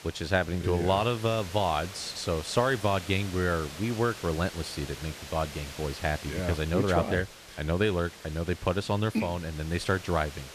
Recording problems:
hiss; noticeable; throughout; 15 dB below the speech

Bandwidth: 14.5 kHz